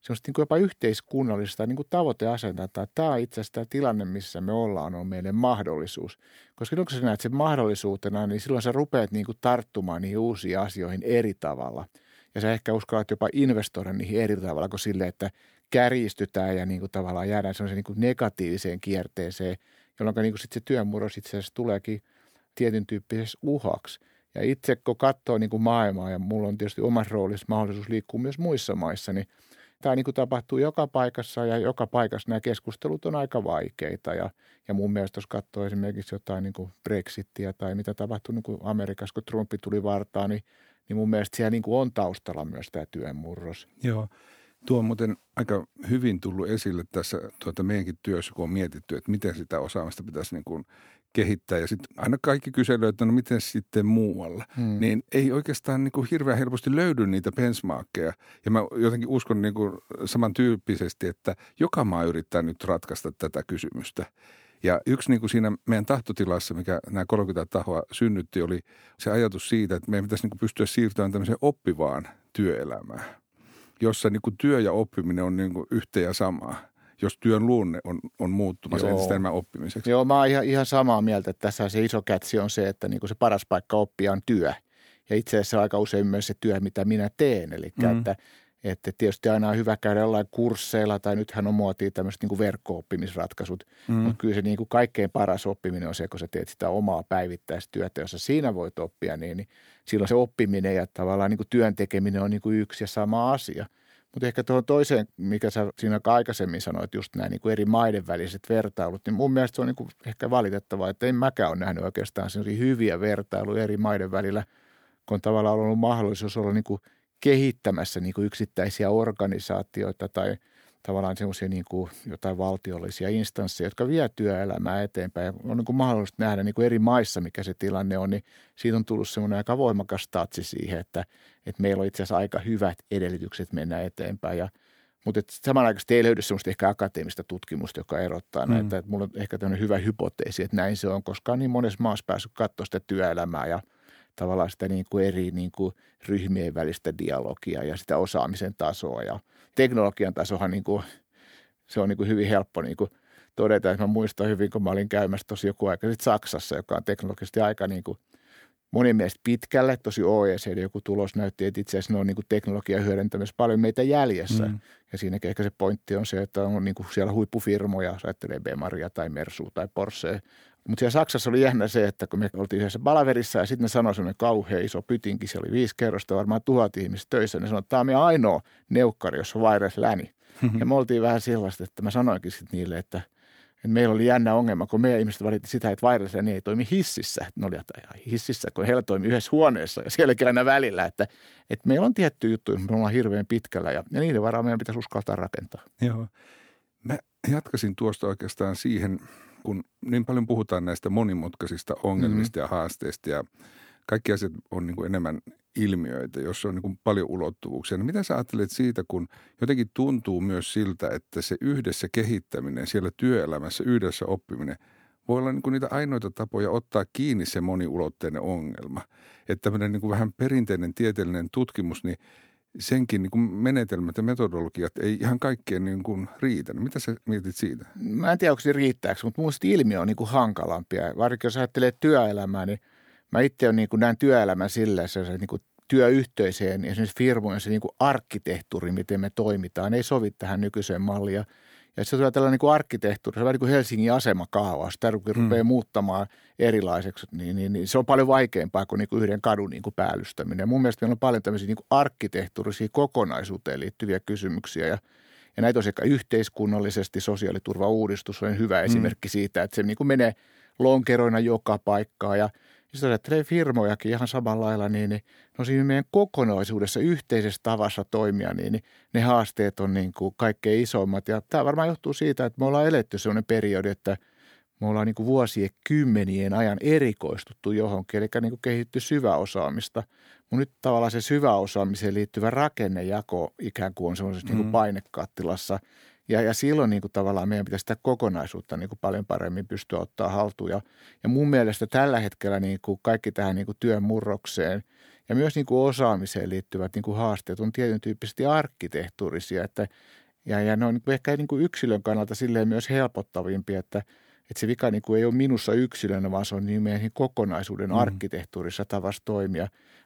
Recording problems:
none

